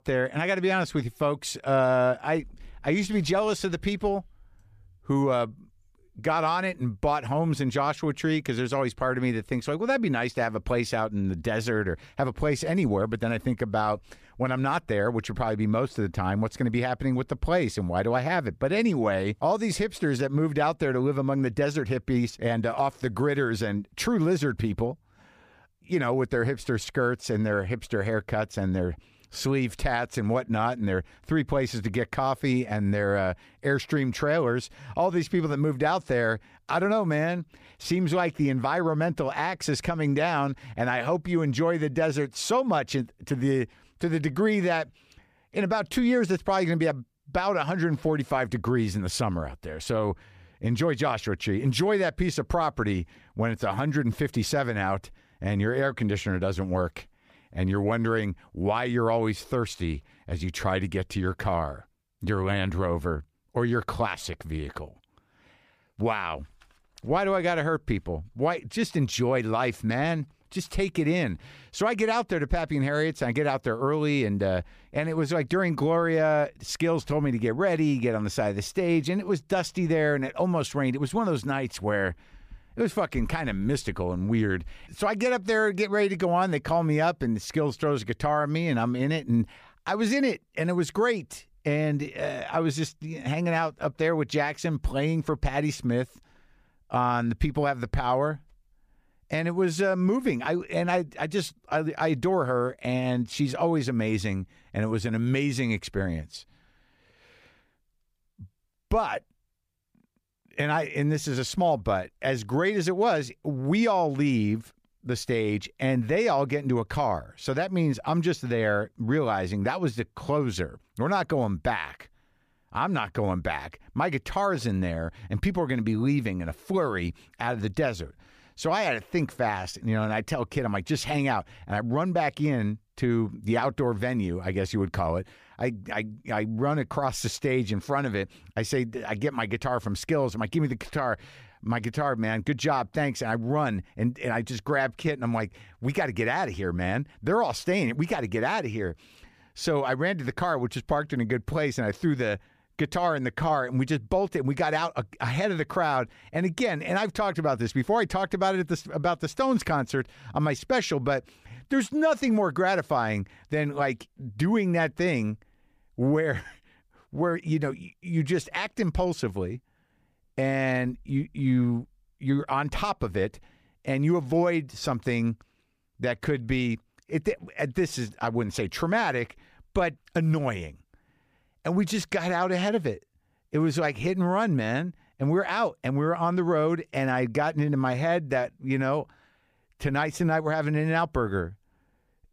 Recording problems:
none

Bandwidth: 15 kHz